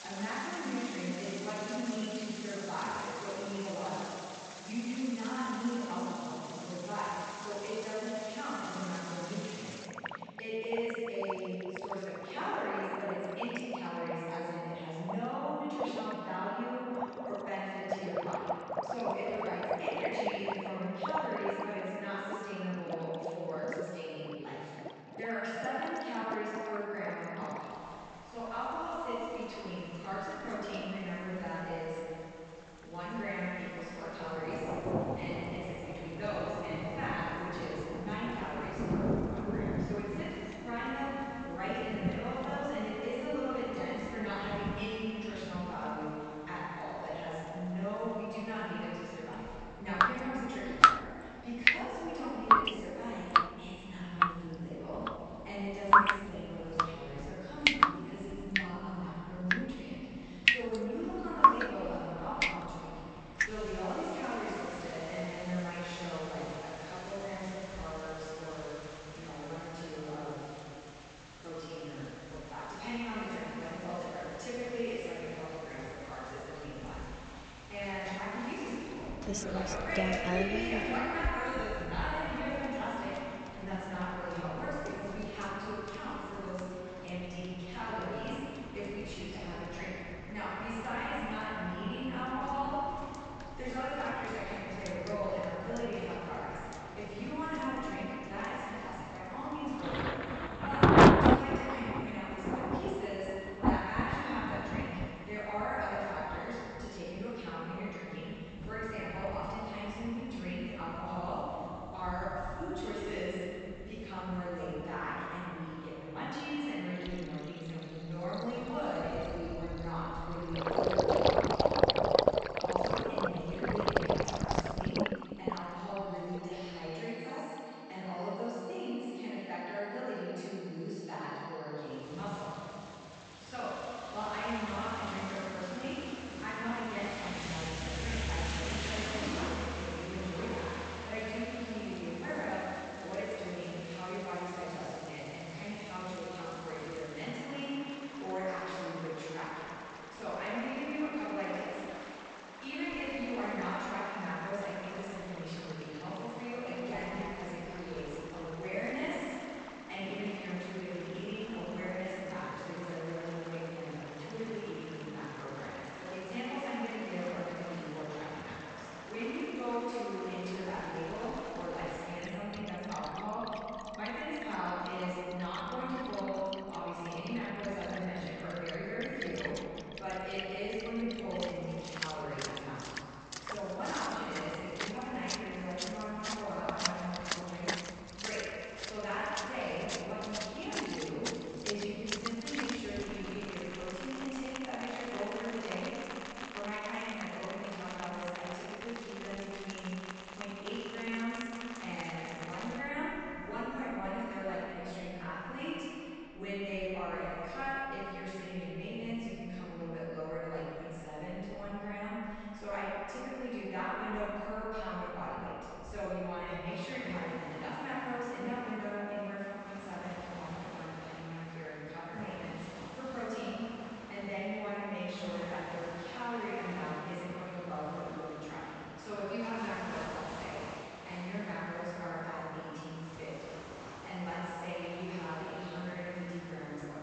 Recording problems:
room echo; strong; dies away in 2.6 s
off-mic speech; far
high frequencies cut off; noticeable; nothing above 8 kHz
rain or running water; very loud; throughout; 3 dB above the speech

